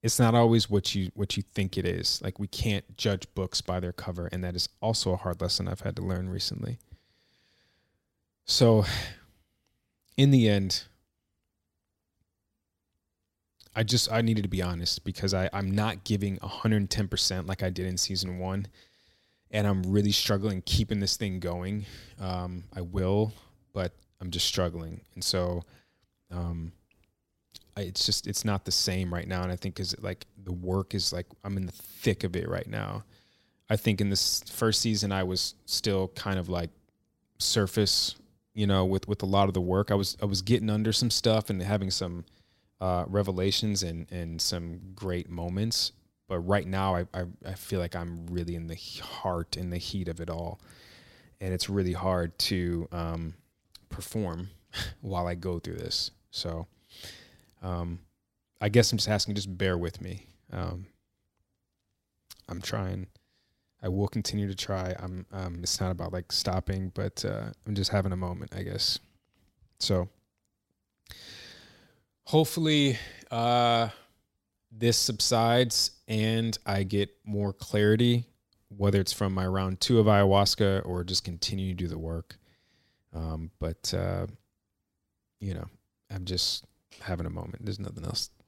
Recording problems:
none

